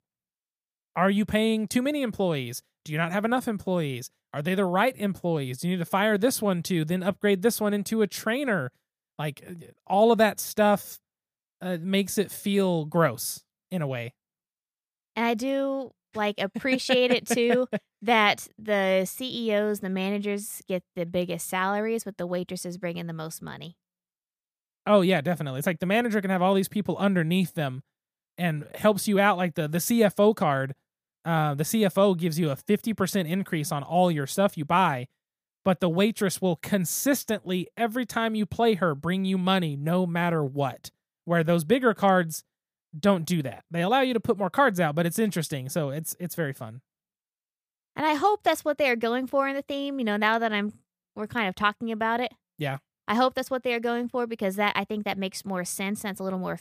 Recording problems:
none

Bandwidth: 15 kHz